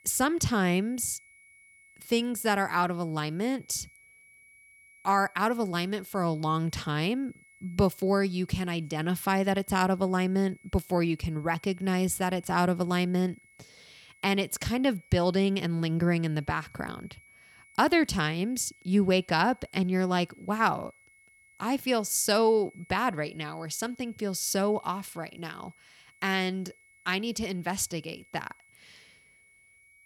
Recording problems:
high-pitched whine; faint; throughout; 2 kHz, 30 dB below the speech

